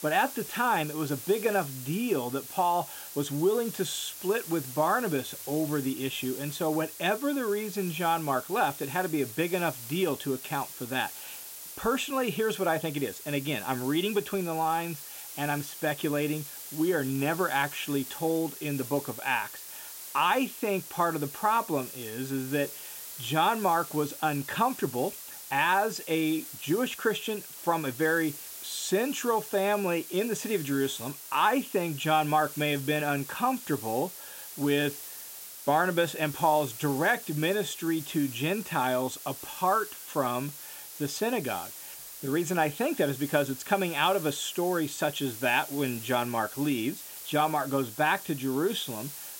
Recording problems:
hiss; noticeable; throughout; 10 dB below the speech

